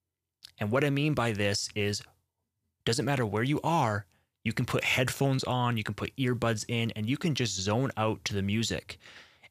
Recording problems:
none

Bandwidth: 14.5 kHz